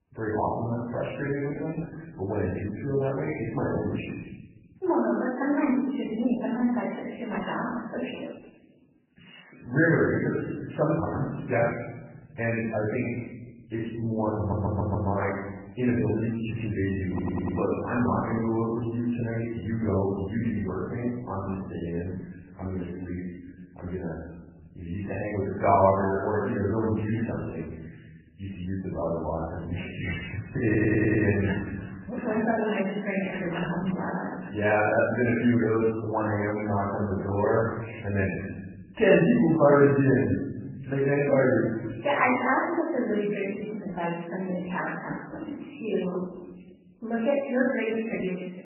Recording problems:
off-mic speech; far
garbled, watery; badly; nothing above 3 kHz
room echo; noticeable; dies away in 1.2 s
audio stuttering; at 14 s, at 17 s and at 31 s

